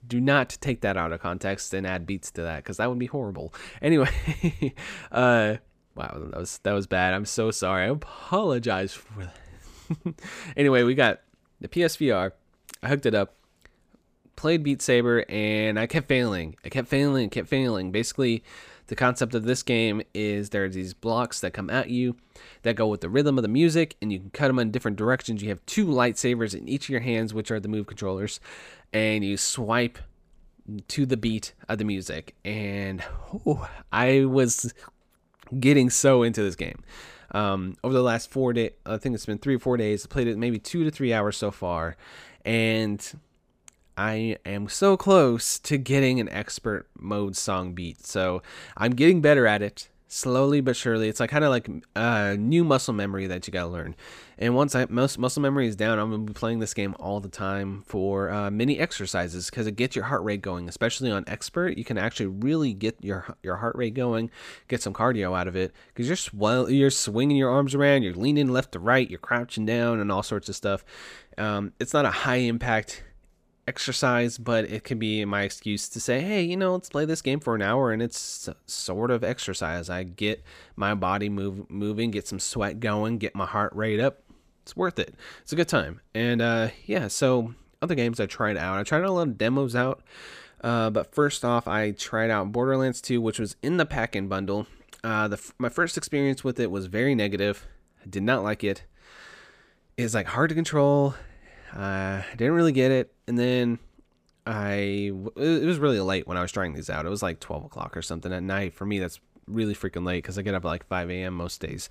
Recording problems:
none

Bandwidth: 15 kHz